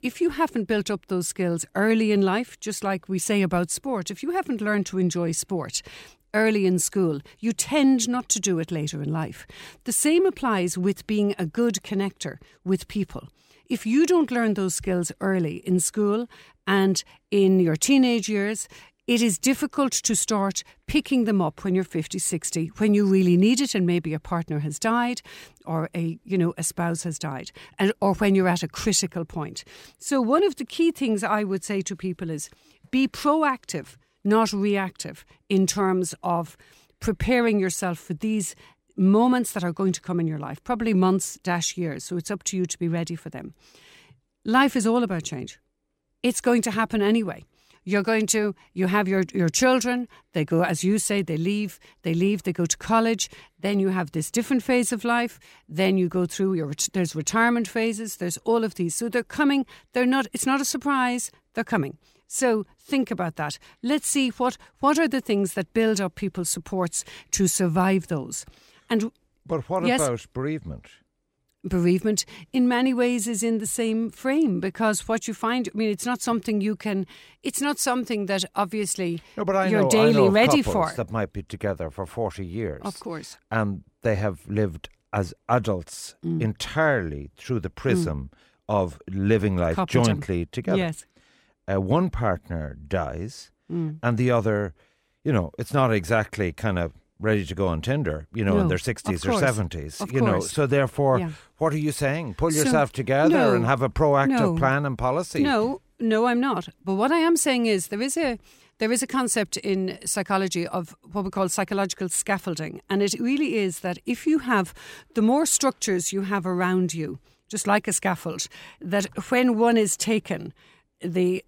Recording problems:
none

